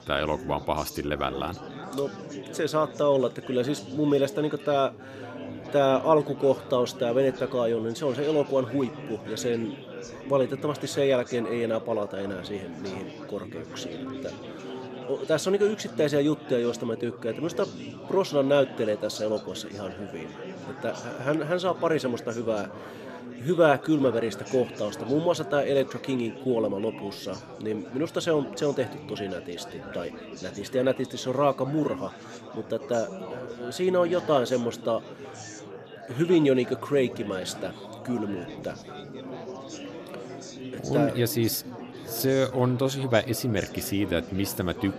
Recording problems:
chatter from many people; noticeable; throughout; 15 dB below the speech

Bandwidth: 14.5 kHz